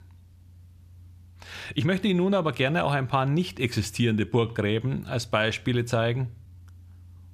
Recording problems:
uneven, jittery; slightly; from 1.5 to 6.5 s

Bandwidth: 14.5 kHz